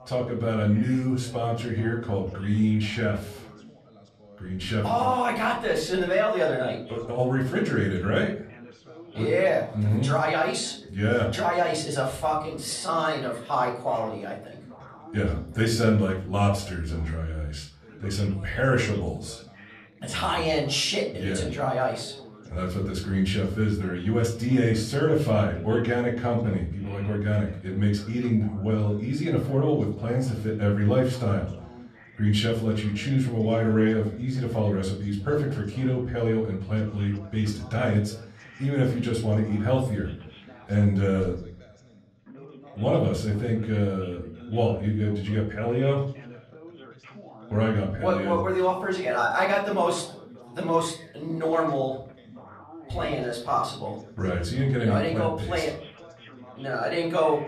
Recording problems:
off-mic speech; far
room echo; slight; dies away in 0.4 s
background chatter; faint; throughout; 2 voices, 20 dB below the speech

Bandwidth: 13.5 kHz